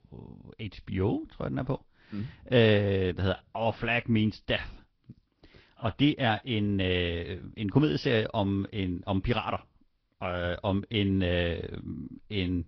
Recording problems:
high frequencies cut off; noticeable; nothing above 5.5 kHz
garbled, watery; slightly

